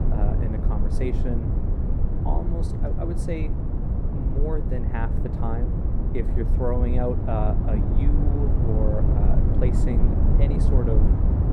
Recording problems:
muffled; slightly; fading above 2 kHz
low rumble; loud; throughout; 2 dB below the speech

